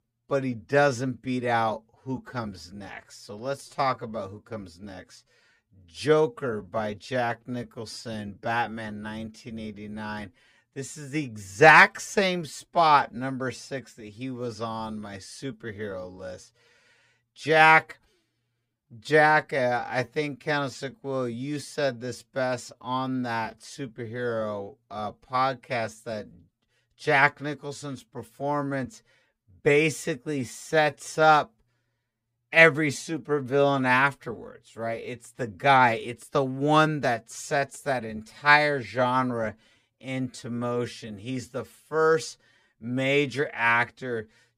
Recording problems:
wrong speed, natural pitch; too slow; 0.6 times normal speed

